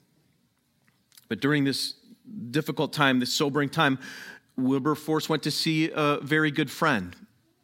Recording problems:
none

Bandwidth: 16 kHz